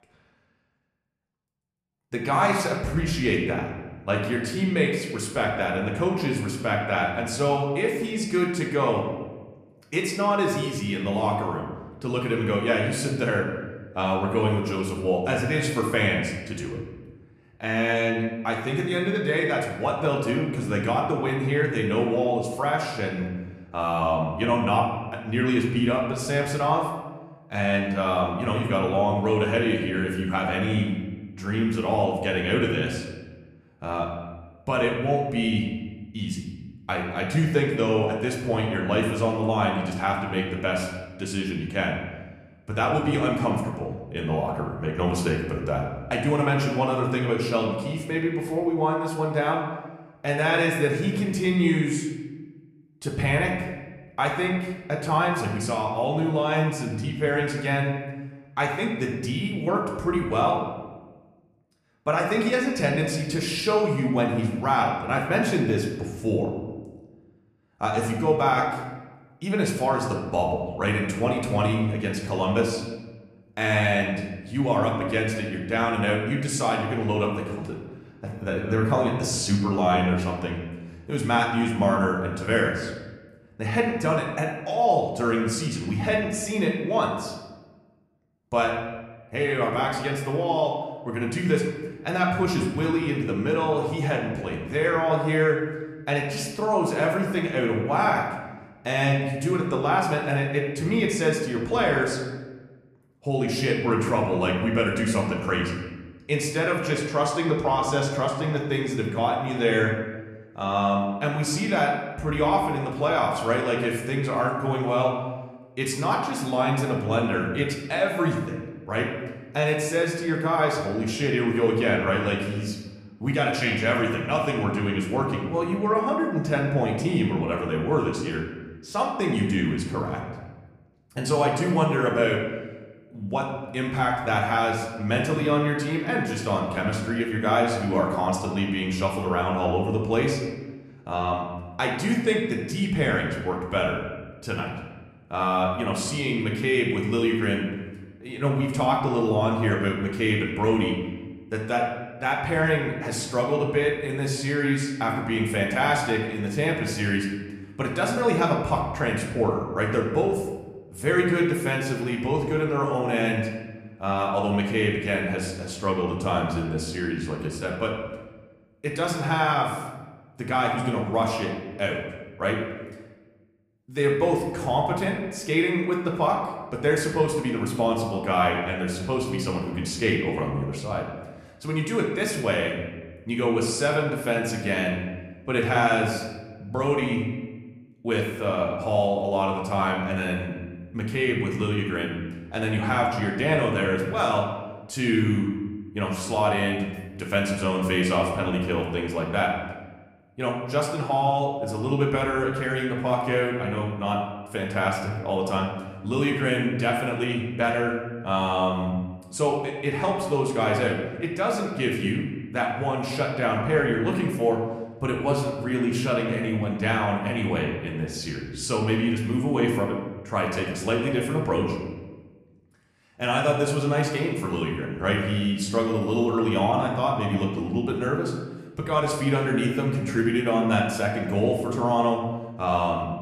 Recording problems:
room echo; noticeable; dies away in 1.1 s
off-mic speech; somewhat distant

